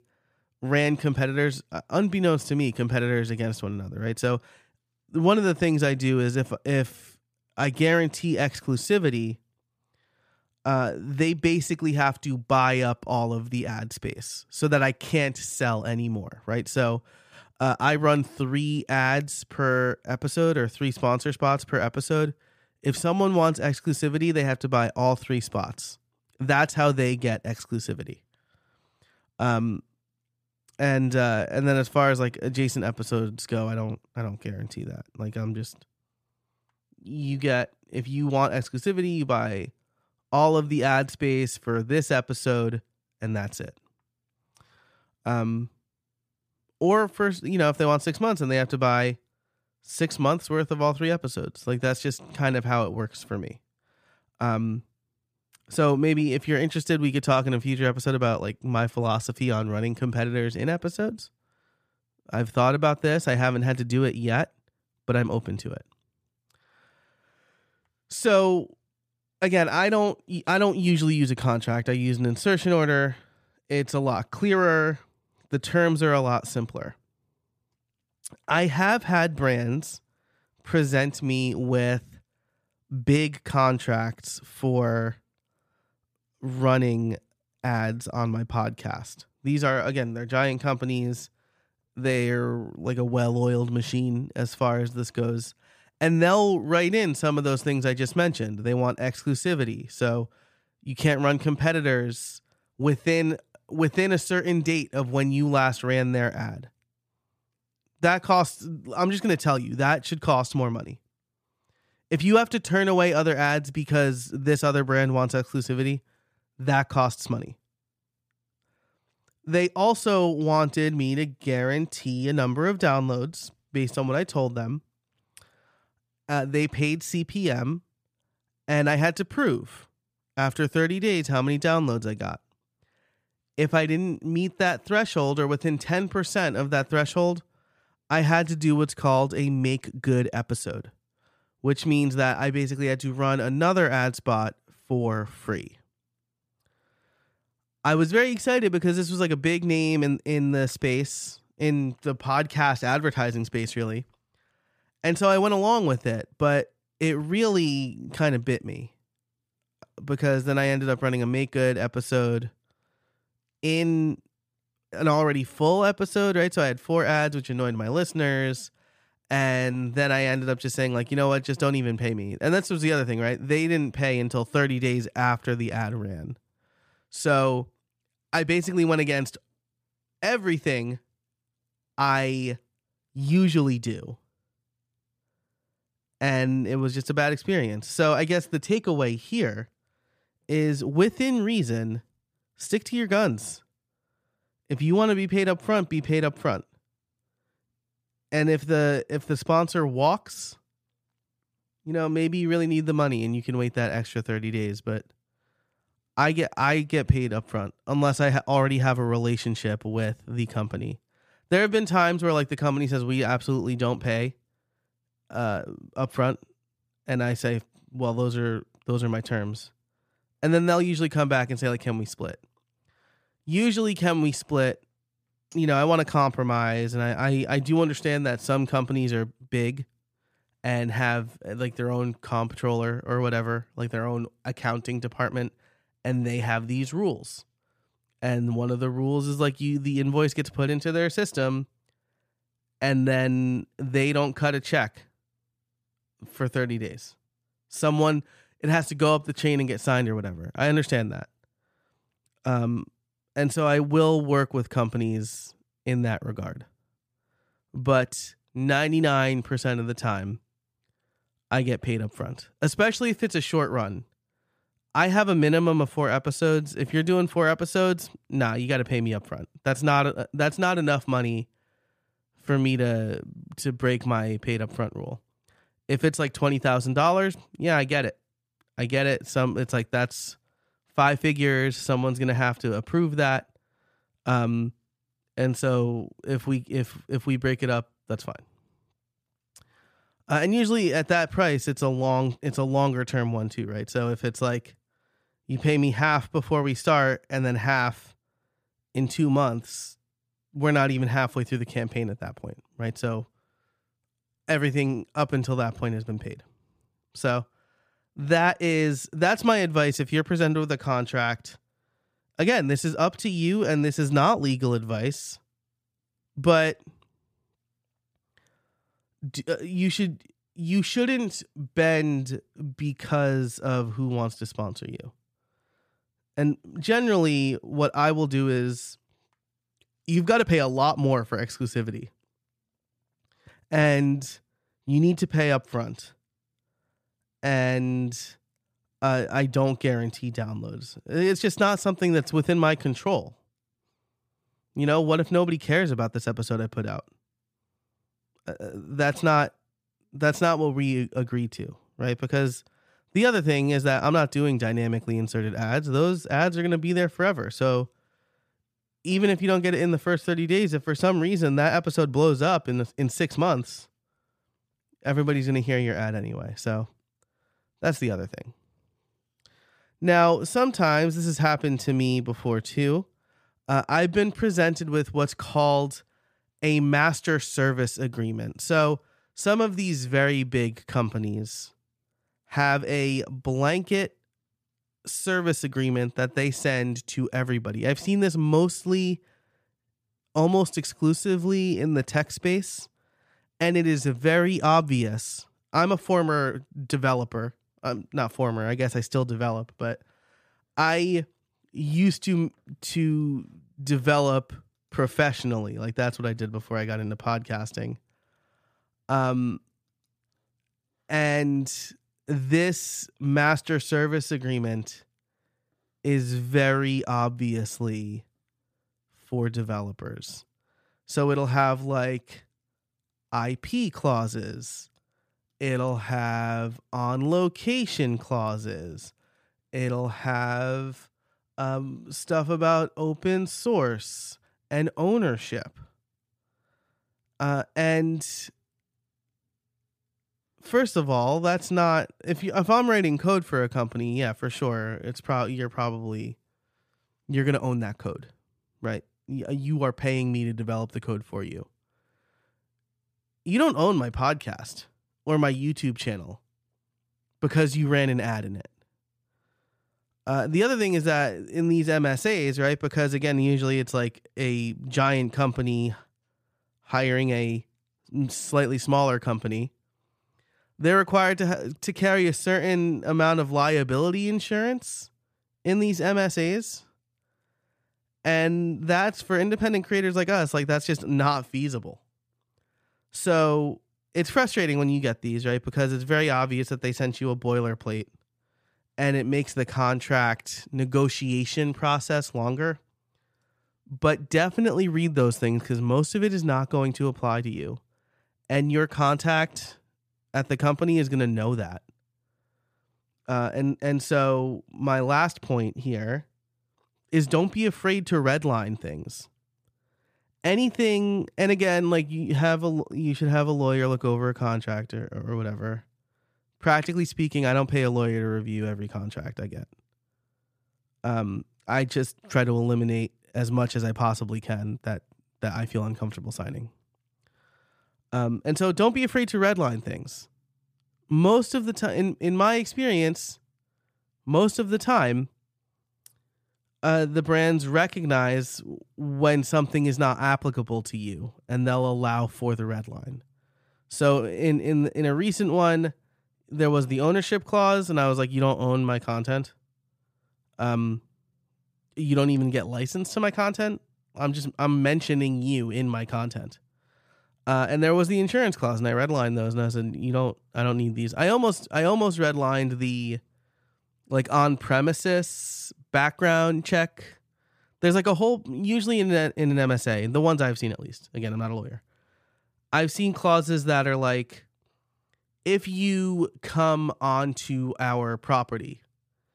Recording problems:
none

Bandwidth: 15 kHz